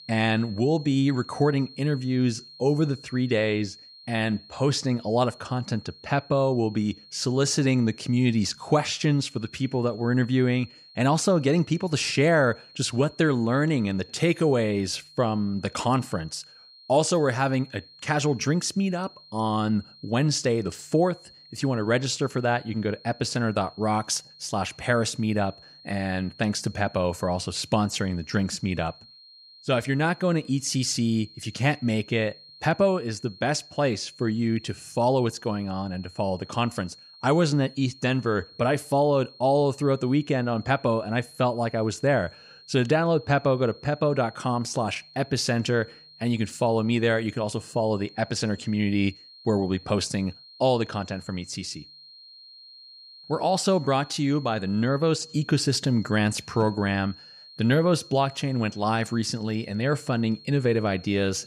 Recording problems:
high-pitched whine; faint; throughout; 4 kHz, 20 dB below the speech

